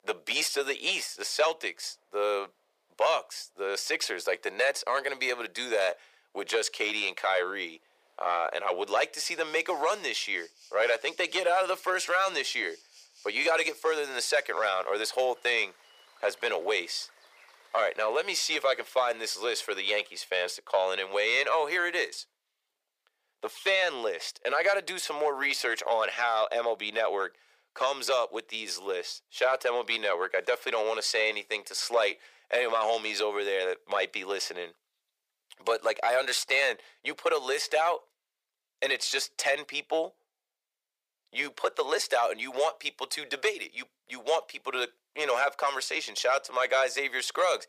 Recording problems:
thin; very; fading below 450 Hz
rain or running water; faint; until 20 s; 25 dB below the speech

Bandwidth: 15 kHz